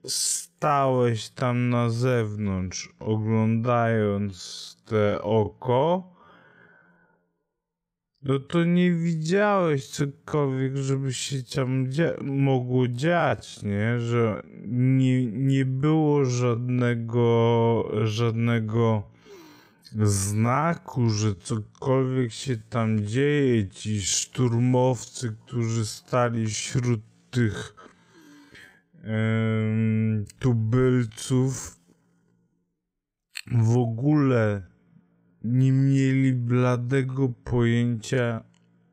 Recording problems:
wrong speed, natural pitch; too slow; 0.5 times normal speed

